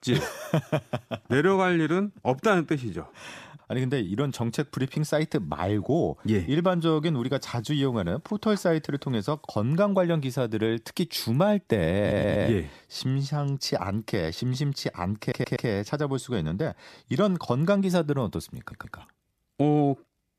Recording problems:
audio stuttering; at 12 s, at 15 s and at 19 s

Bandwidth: 14.5 kHz